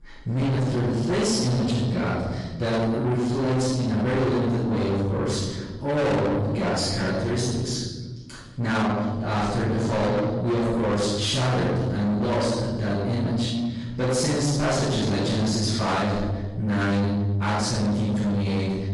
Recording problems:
distortion; heavy; 7 dB below the speech
room echo; strong; dies away in 1.3 s
off-mic speech; far
garbled, watery; slightly; nothing above 11 kHz

